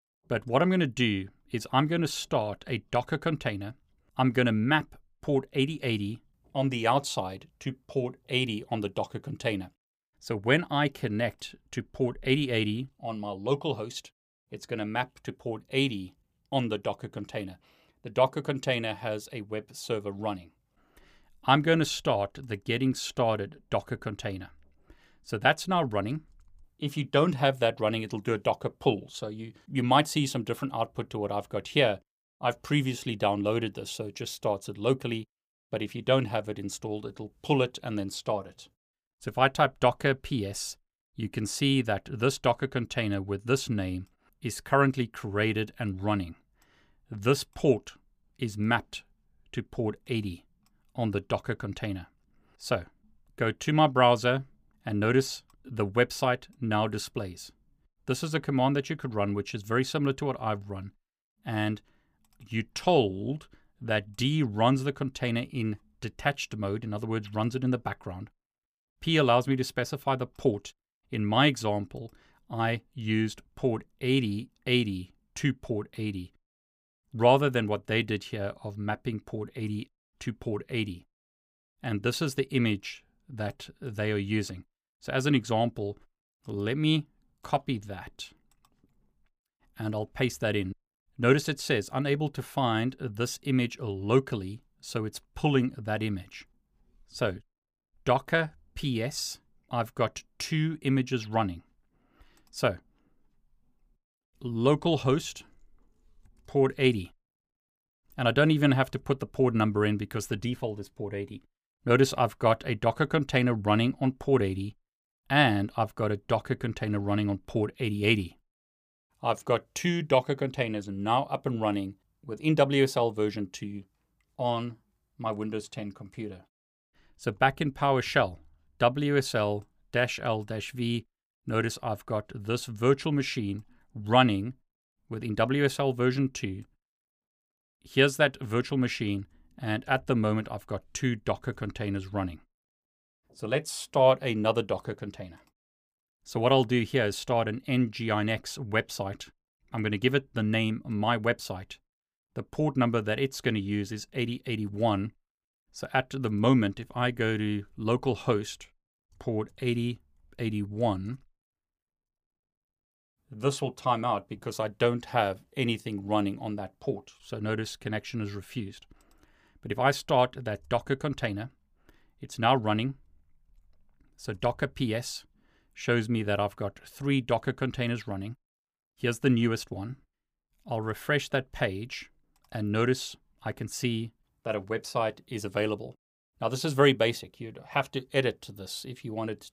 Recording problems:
none

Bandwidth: 15 kHz